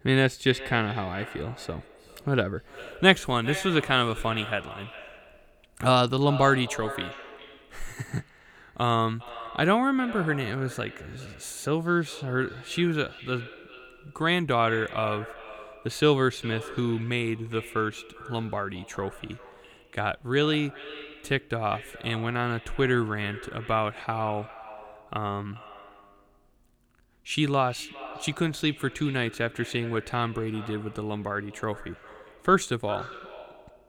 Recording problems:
echo of what is said; noticeable; throughout; 410 ms later, 15 dB below the speech

